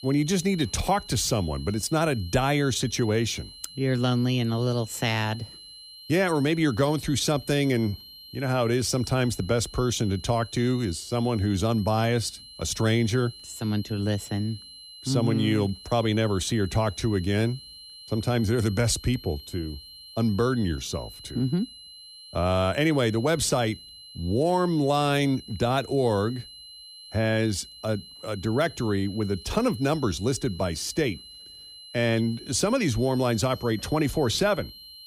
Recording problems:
high-pitched whine; noticeable; throughout; 4 kHz, 15 dB below the speech

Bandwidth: 15 kHz